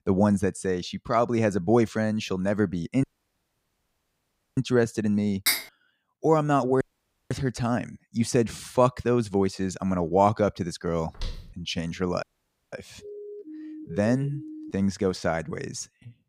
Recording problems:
audio cutting out; at 3 s for 1.5 s, at 7 s for 0.5 s and at 12 s
clattering dishes; loud; at 5.5 s; peak 1 dB above the speech
footsteps; faint; at 11 s; peak 15 dB below the speech
siren; faint; from 13 to 15 s; peak 15 dB below the speech

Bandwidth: 15.5 kHz